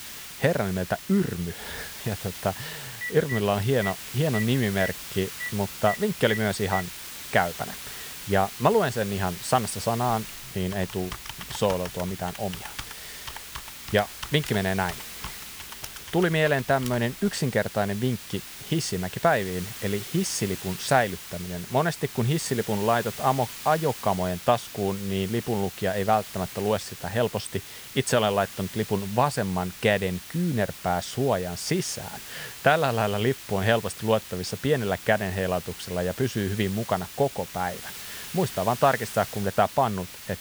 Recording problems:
hiss; noticeable; throughout; 10 dB below the speech
phone ringing; noticeable; from 3 to 7 s; peak 6 dB below the speech
keyboard typing; faint; from 10 to 17 s; peak 10 dB below the speech

